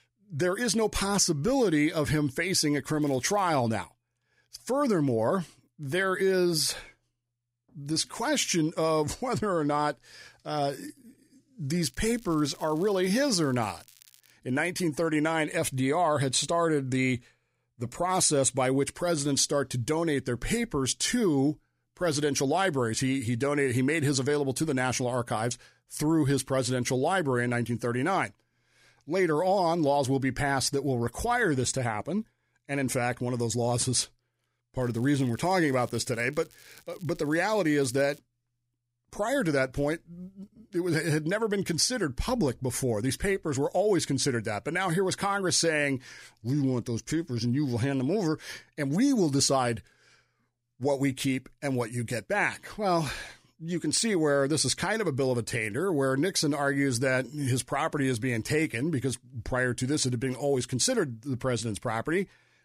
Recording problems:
crackling; faint; at 3 s, from 12 to 14 s and from 35 to 38 s; 25 dB below the speech

